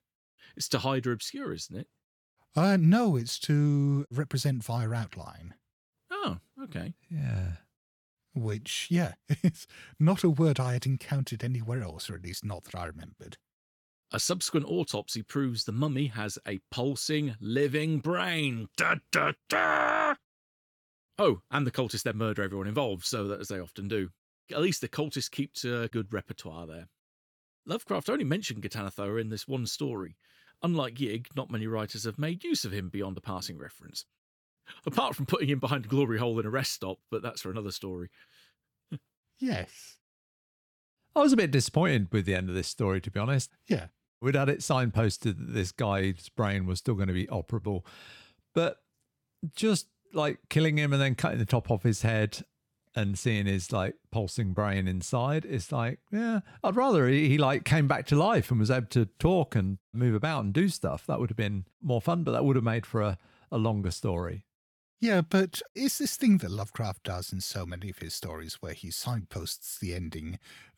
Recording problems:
none

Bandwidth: 18 kHz